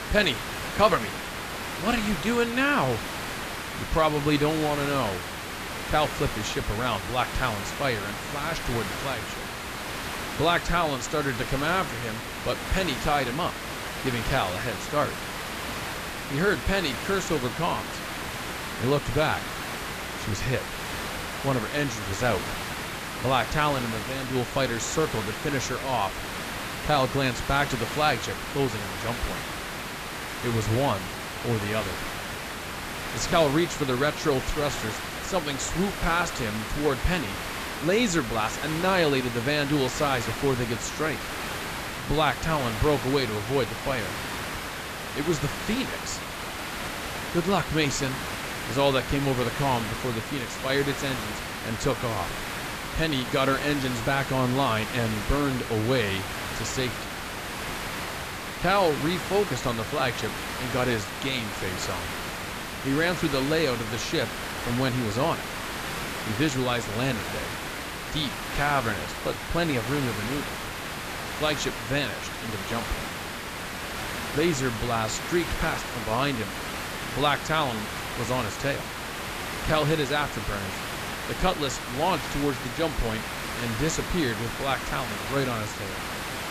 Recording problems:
high frequencies cut off; noticeable; nothing above 8 kHz
hiss; loud; throughout; 5 dB below the speech

